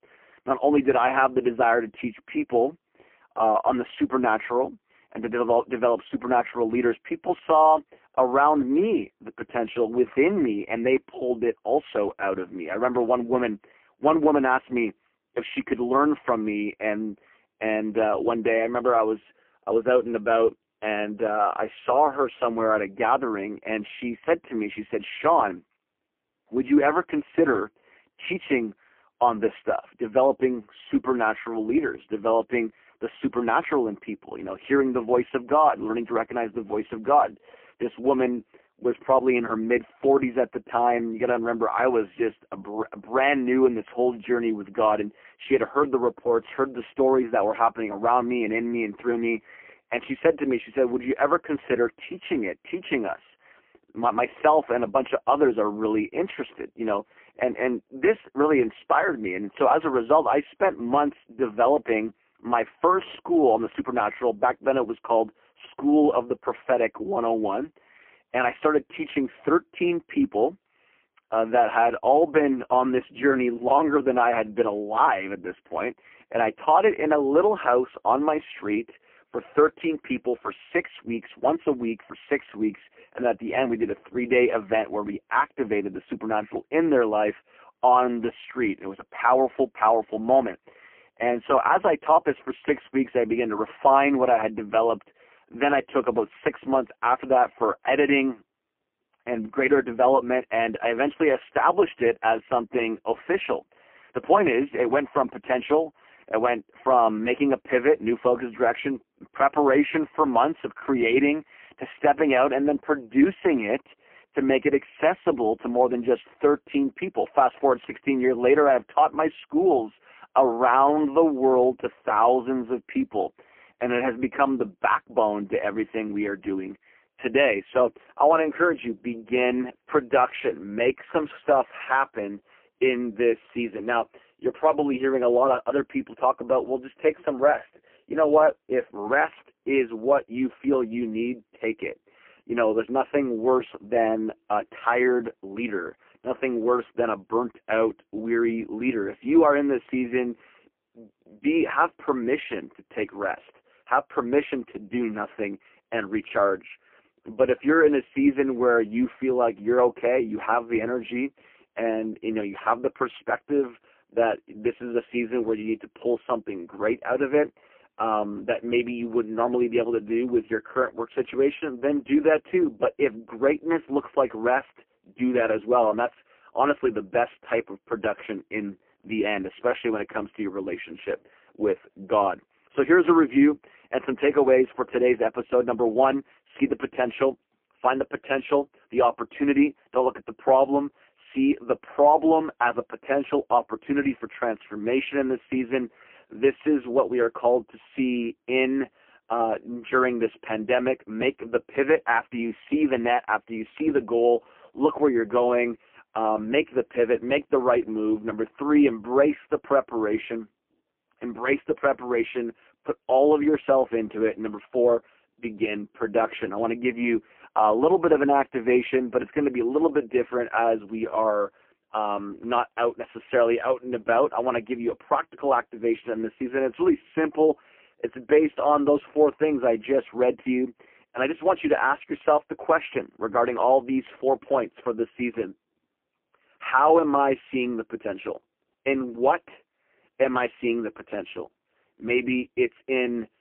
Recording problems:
phone-call audio; poor line

